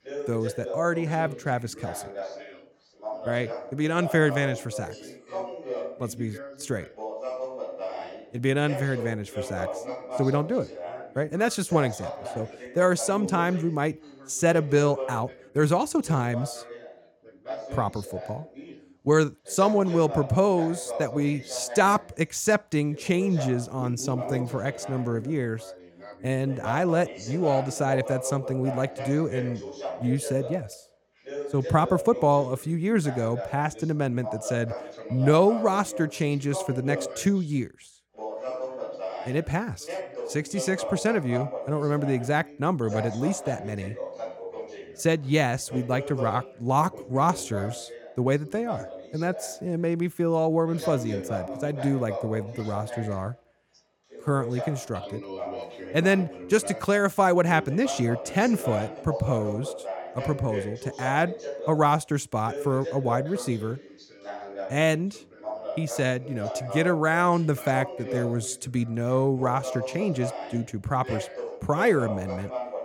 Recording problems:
background chatter; loud; throughout; 2 voices, 10 dB below the speech

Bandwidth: 17 kHz